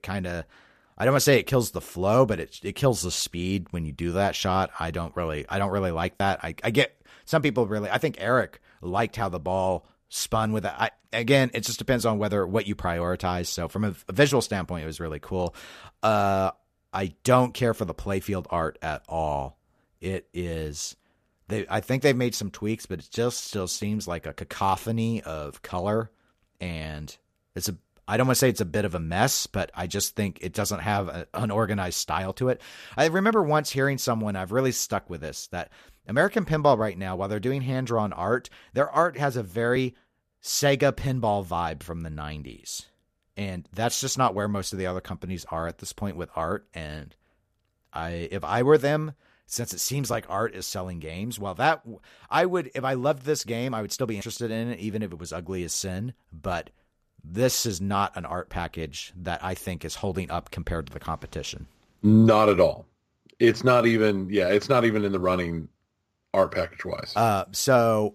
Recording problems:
none

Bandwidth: 14.5 kHz